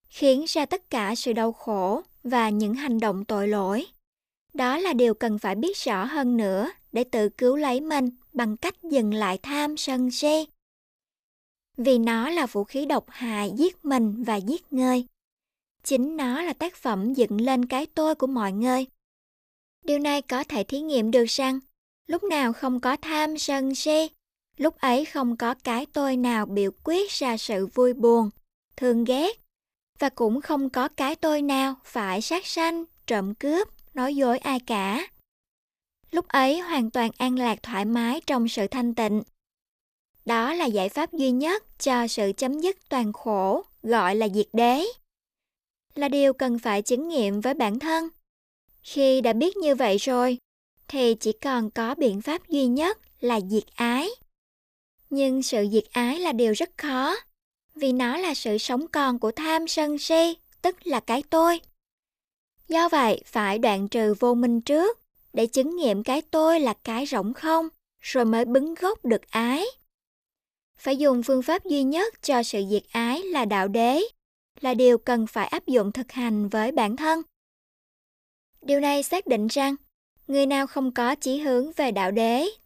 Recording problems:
none

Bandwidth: 14.5 kHz